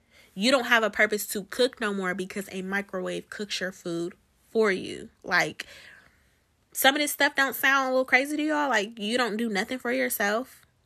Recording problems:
none

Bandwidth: 14 kHz